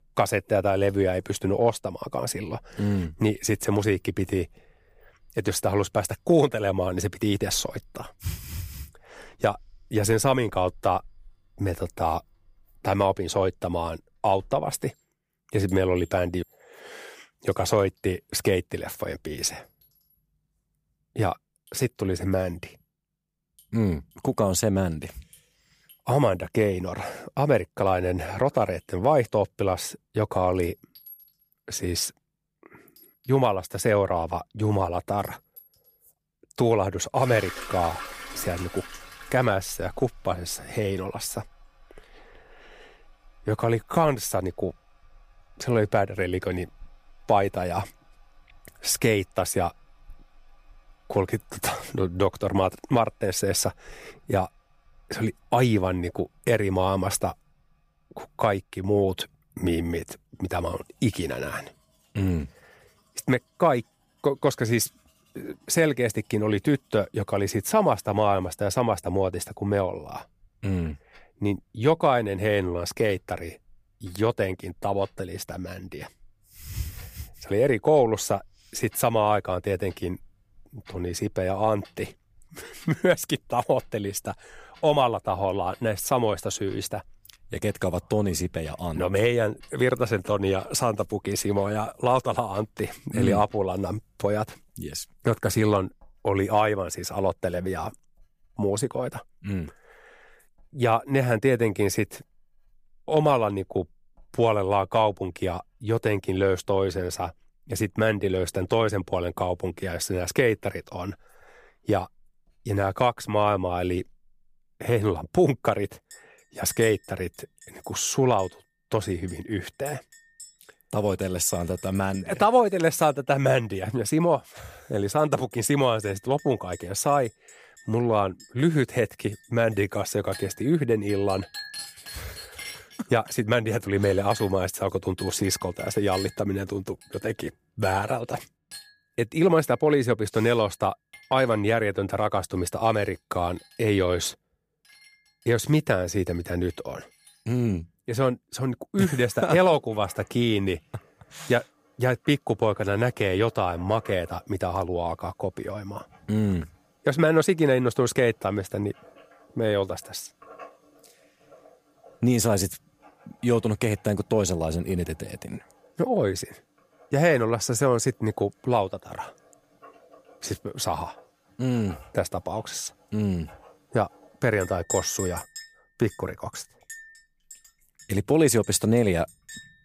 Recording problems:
household noises; faint; throughout; 20 dB below the speech

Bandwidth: 15 kHz